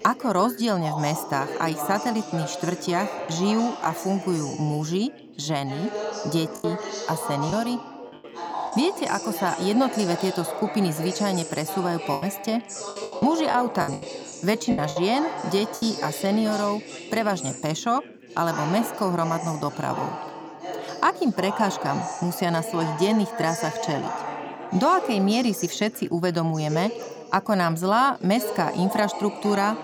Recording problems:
background chatter; loud; throughout; 4 voices, 8 dB below the speech
choppy; very; at 6.5 s and from 12 to 16 s; 13% of the speech affected

